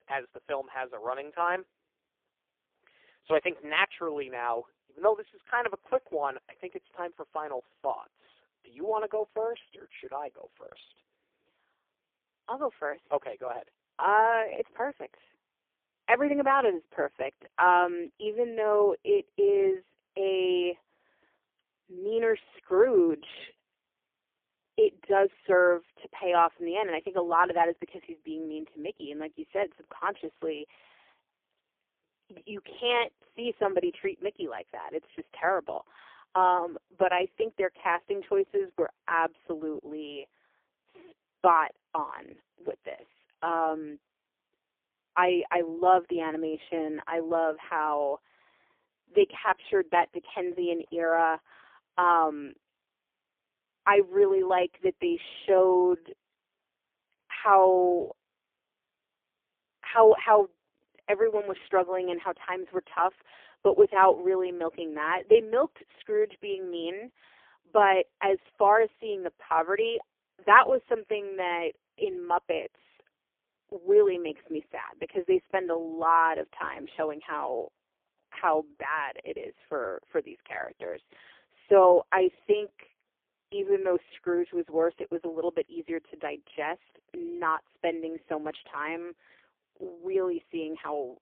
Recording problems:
phone-call audio; poor line; nothing above 3.5 kHz

